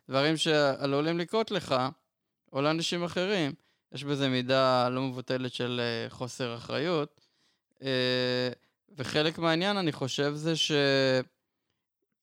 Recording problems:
none

